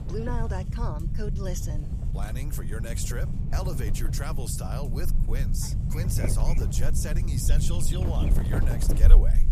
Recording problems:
wind noise on the microphone; heavy; 8 dB below the speech
low rumble; loud; throughout; 6 dB below the speech
electrical hum; faint; throughout; 60 Hz, 25 dB below the speech
animal sounds; very faint; throughout; 15 dB below the speech

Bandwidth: 14.5 kHz